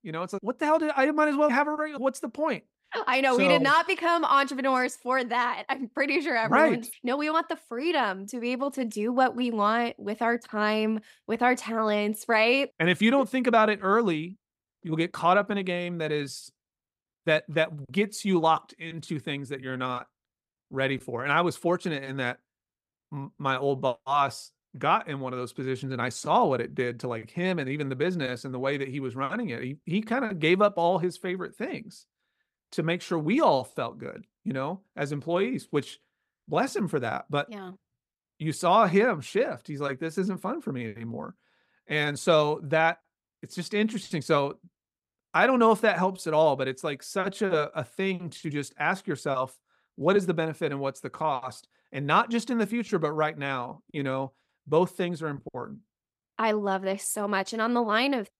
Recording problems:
none

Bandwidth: 15.5 kHz